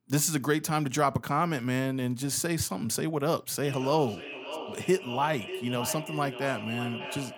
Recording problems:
echo of what is said; strong; from 3.5 s on; 590 ms later, 9 dB below the speech

